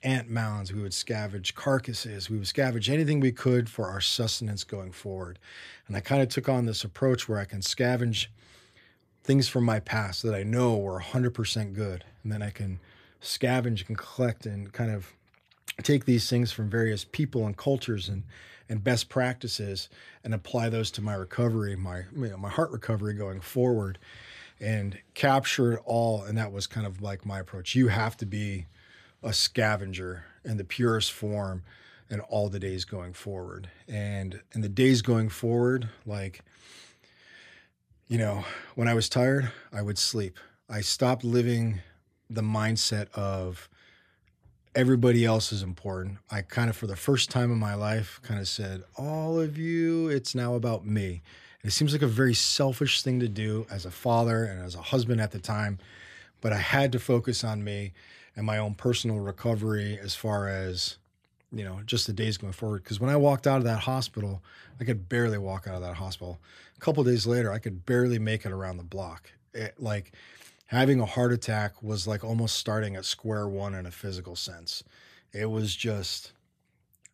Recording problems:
none

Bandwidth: 14.5 kHz